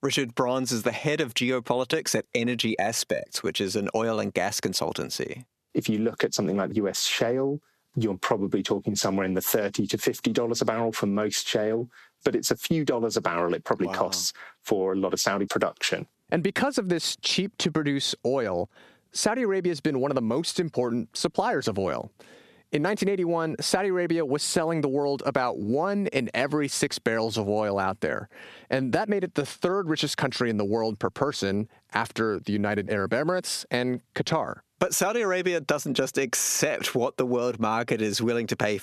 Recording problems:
squashed, flat; heavily

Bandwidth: 13.5 kHz